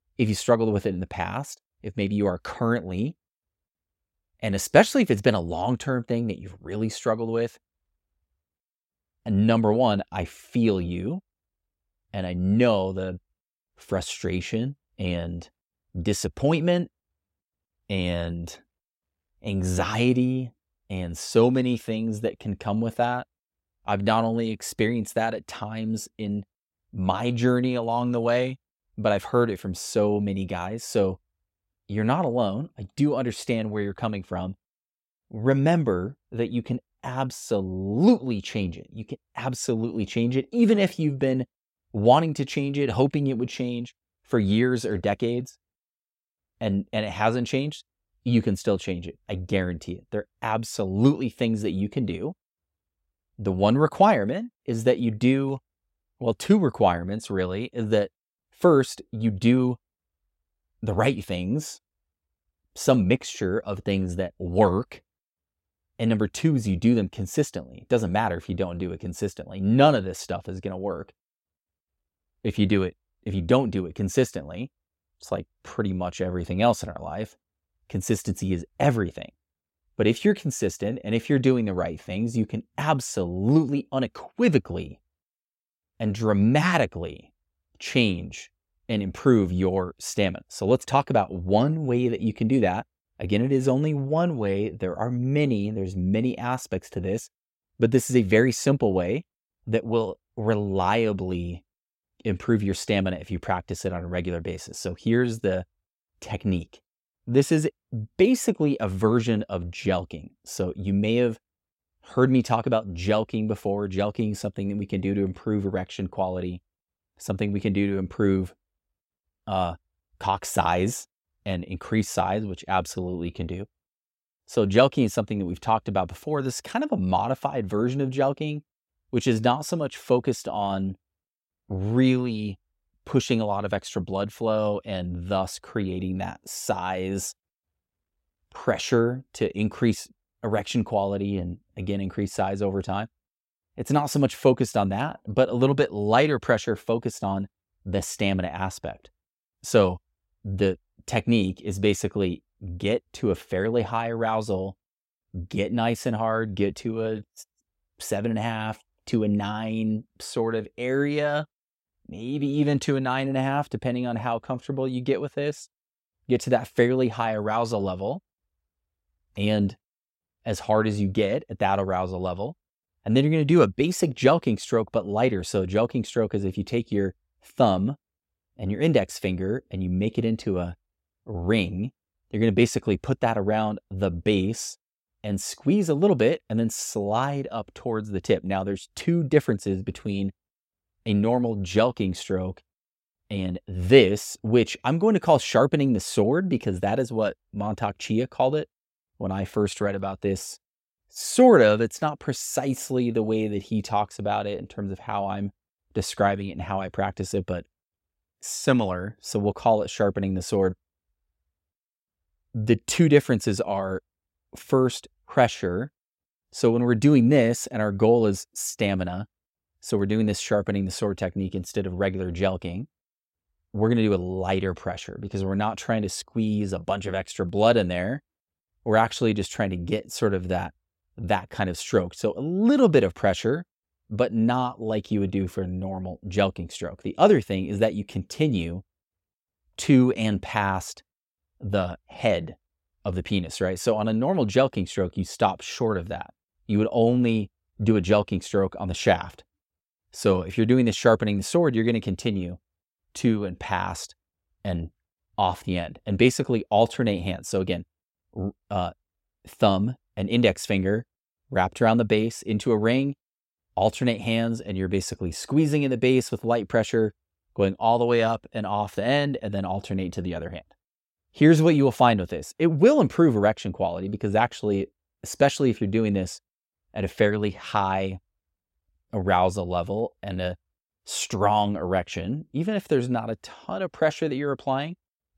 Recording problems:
none

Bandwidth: 16 kHz